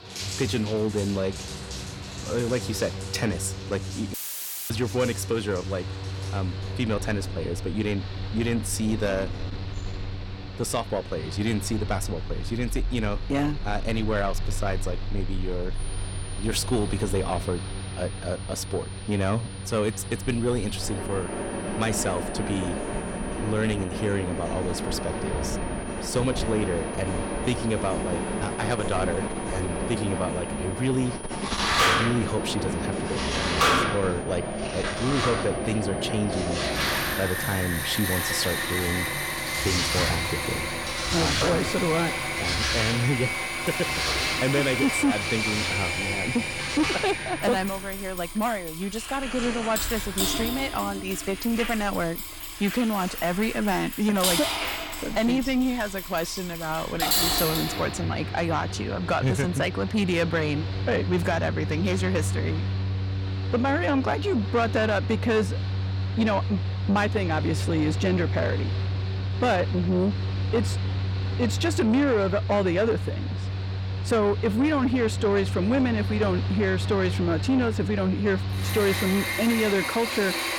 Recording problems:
distortion; slight; 10 dB below the speech
household noises; loud; until 57 s; 5 dB below the speech
machinery noise; loud; throughout; 3 dB below the speech
high-pitched whine; noticeable; from 16 to 55 s; 9.5 kHz, 15 dB below the speech
audio cutting out; filled with static; at 4 s for 0.5 s

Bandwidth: 17 kHz